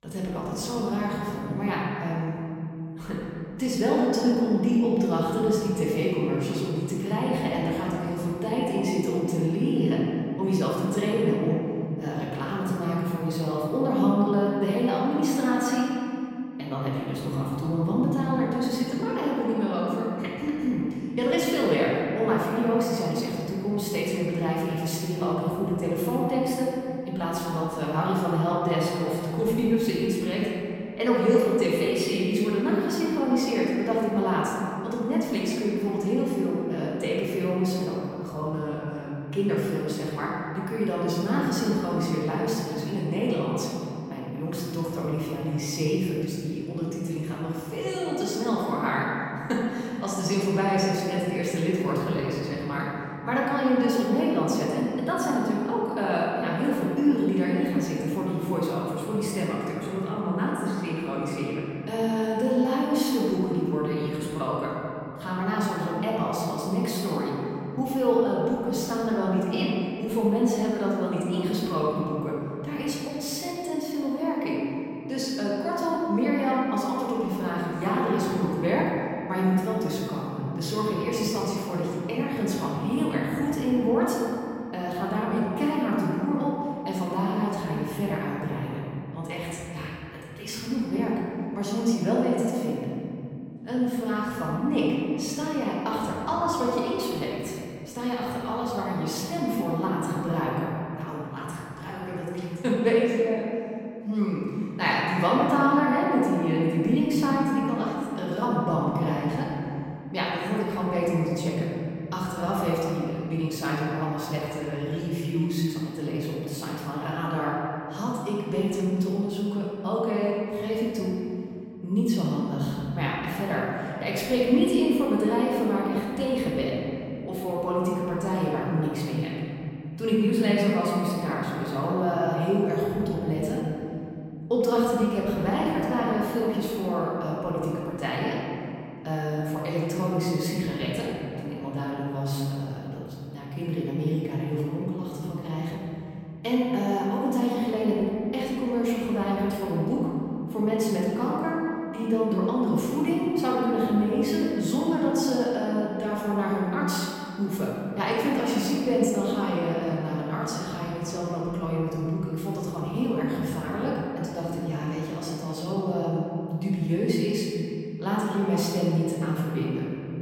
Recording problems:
room echo; strong; dies away in 3 s
off-mic speech; far

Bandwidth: 16 kHz